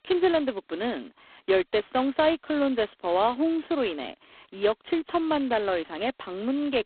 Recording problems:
phone-call audio; poor line; nothing above 4 kHz

